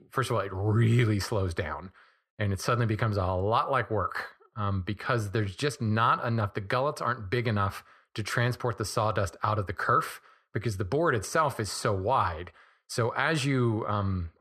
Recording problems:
muffled; slightly; fading above 3 kHz

